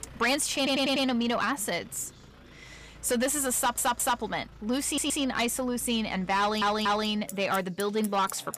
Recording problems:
distortion; slight; 10 dB below the speech
traffic noise; faint; throughout; 20 dB below the speech
background chatter; faint; throughout; 4 voices, 30 dB below the speech
audio stuttering; 4 times, first at 0.5 s

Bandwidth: 15 kHz